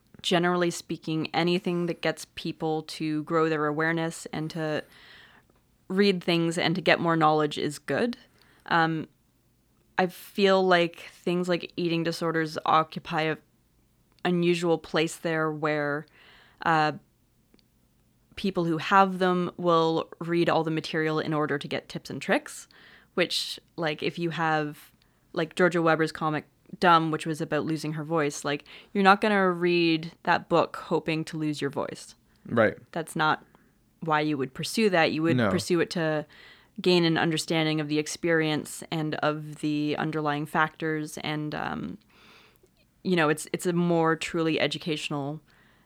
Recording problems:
none

